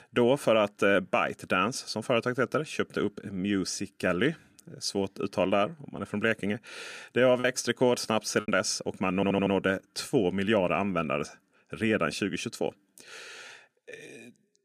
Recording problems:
choppy; occasionally; from 7.5 to 8.5 s; 2% of the speech affected
audio stuttering; at 9 s

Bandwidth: 15 kHz